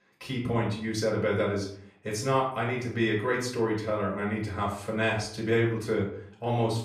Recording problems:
off-mic speech; far
room echo; slight; dies away in 0.5 s

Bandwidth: 14.5 kHz